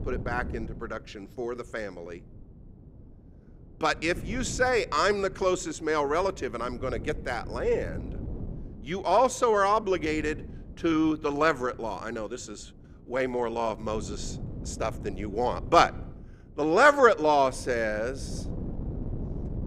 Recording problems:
wind noise on the microphone; occasional gusts; 25 dB below the speech

